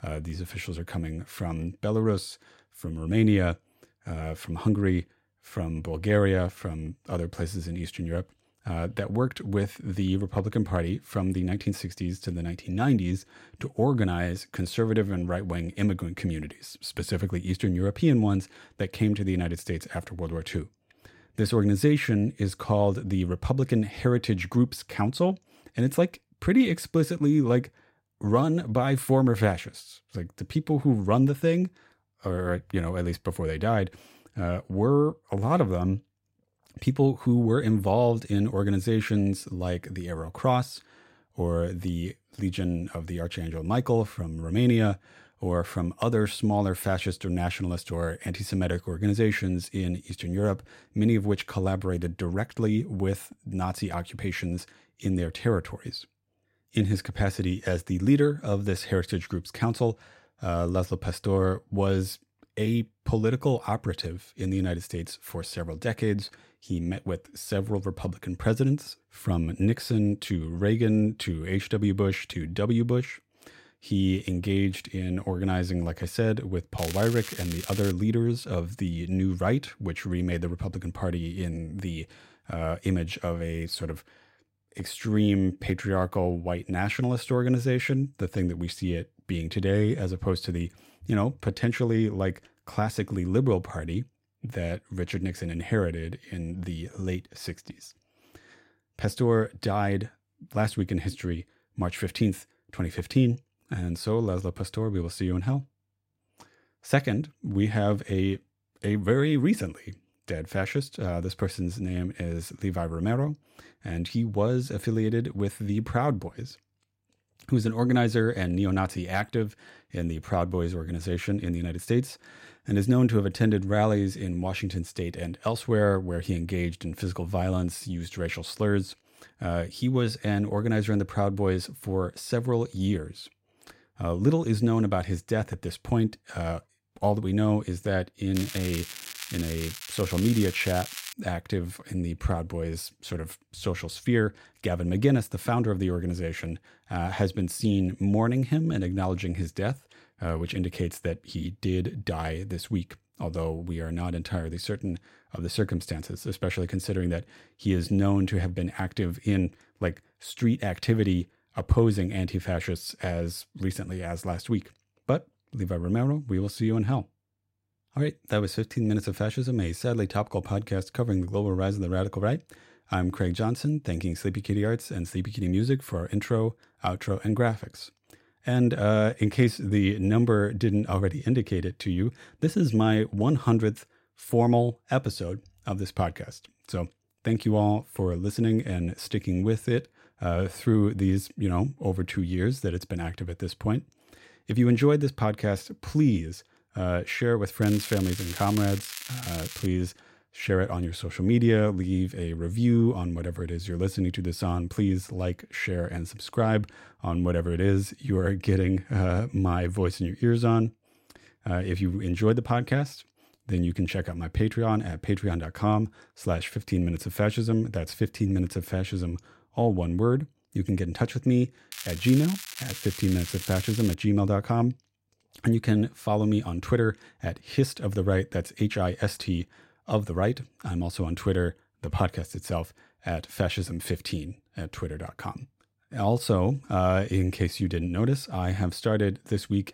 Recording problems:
crackling; loud; 4 times, first at 1:17; 10 dB below the speech

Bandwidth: 16 kHz